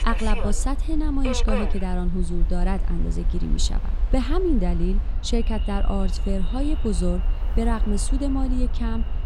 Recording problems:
echo of what is said; faint; from 5.5 s on; 370 ms later, 20 dB below the speech
train or aircraft noise; noticeable; throughout; 10 dB below the speech
low rumble; faint; throughout; 20 dB below the speech

